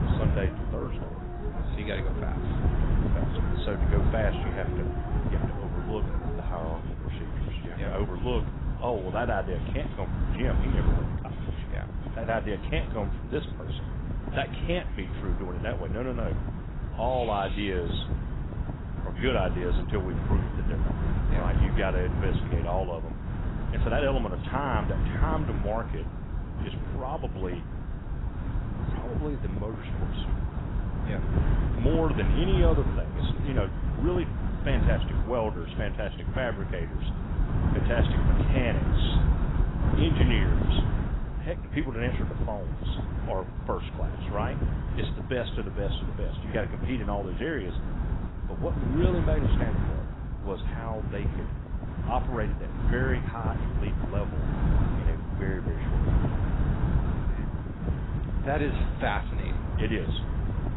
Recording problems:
garbled, watery; badly; nothing above 4 kHz
wind noise on the microphone; heavy; 6 dB below the speech
animal sounds; noticeable; until 18 s; 10 dB below the speech

